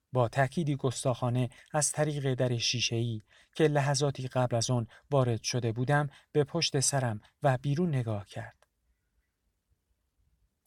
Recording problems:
none

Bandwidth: 17.5 kHz